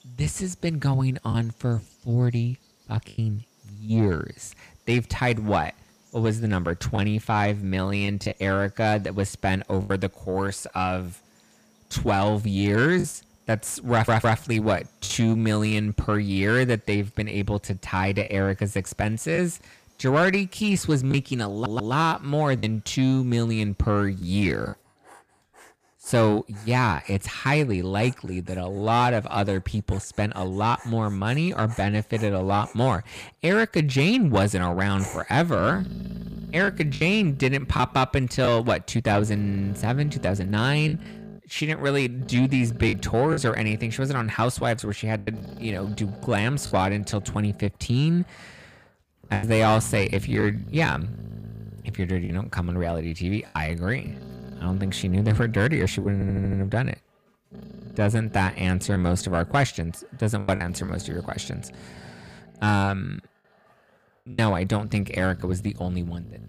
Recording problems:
distortion; slight; 10 dB below the speech
animal sounds; noticeable; throughout; 15 dB below the speech
choppy; occasionally; 3% of the speech affected
audio stuttering; at 14 s, at 22 s and at 56 s

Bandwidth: 15 kHz